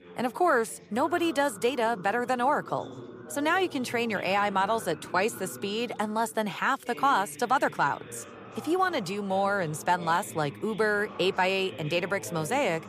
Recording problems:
background chatter; noticeable; throughout; 4 voices, 15 dB below the speech

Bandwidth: 15 kHz